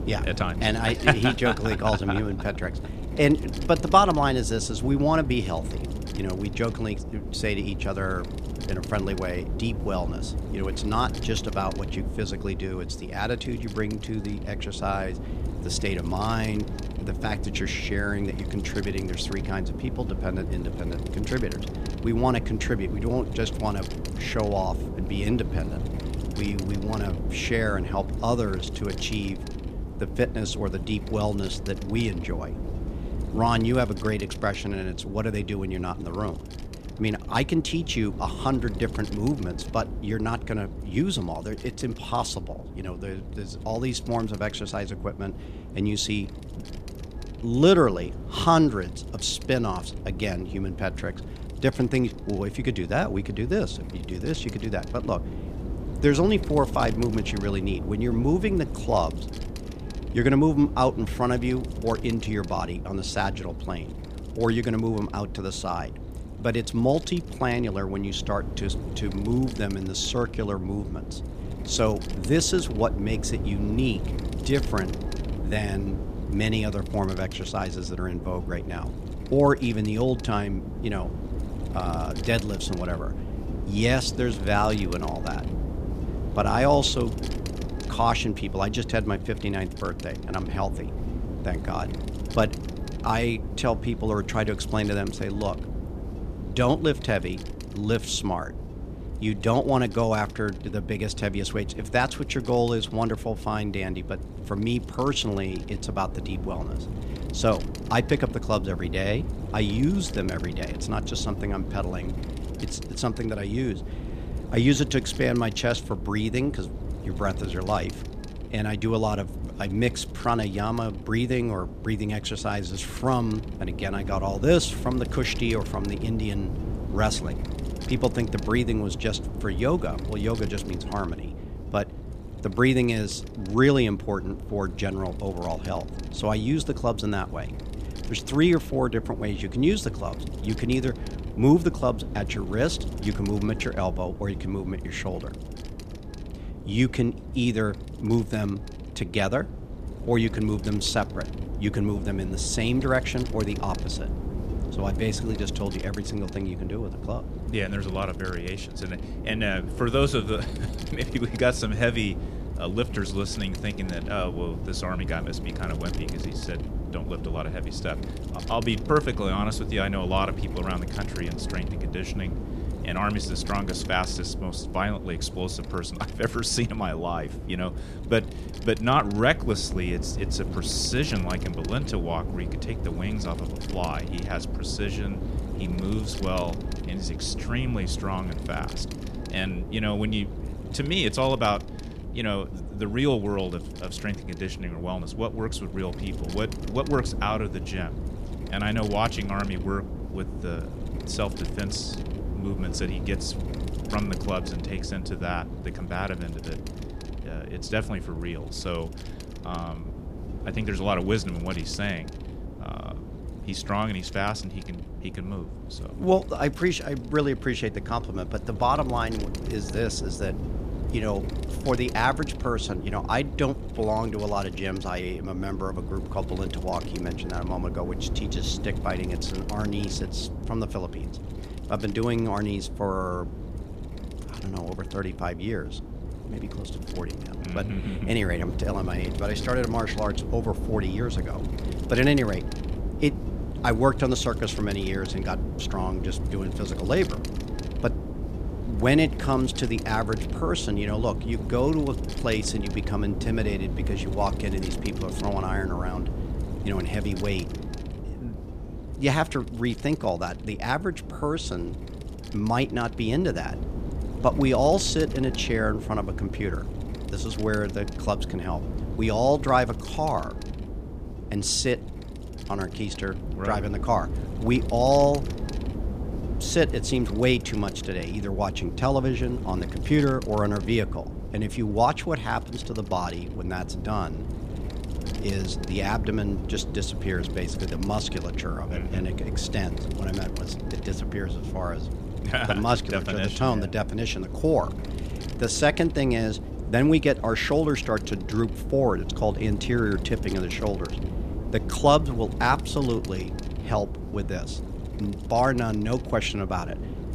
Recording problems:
wind noise on the microphone; occasional gusts; 15 dB below the speech

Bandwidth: 14.5 kHz